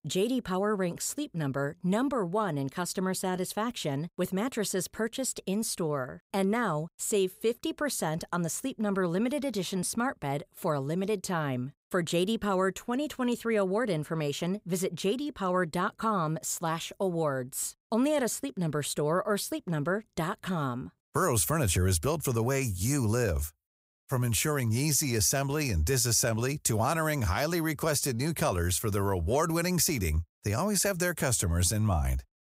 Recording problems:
none

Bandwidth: 15.5 kHz